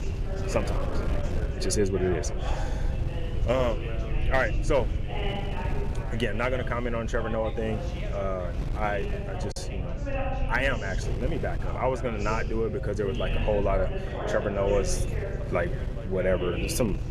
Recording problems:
background chatter; loud; throughout; 3 voices, 8 dB below the speech
wind noise on the microphone; occasional gusts; 15 dB below the speech
low rumble; faint; throughout; 20 dB below the speech
choppy; occasionally; at 9.5 s; 2% of the speech affected

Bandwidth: 14 kHz